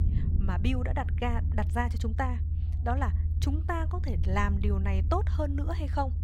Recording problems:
low rumble; noticeable; throughout; 10 dB below the speech

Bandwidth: 16 kHz